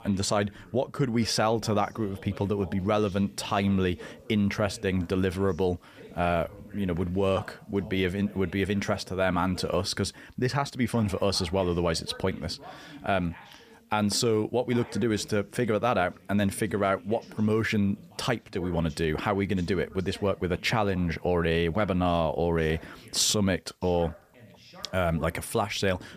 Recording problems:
voice in the background; faint; throughout; 20 dB below the speech

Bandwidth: 15 kHz